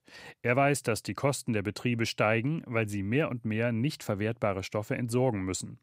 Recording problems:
none

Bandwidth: 15.5 kHz